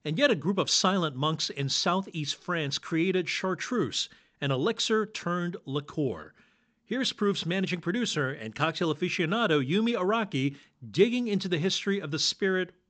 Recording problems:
high frequencies cut off; noticeable; nothing above 8 kHz

